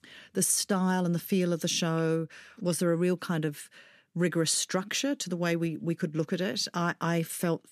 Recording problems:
none

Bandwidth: 14 kHz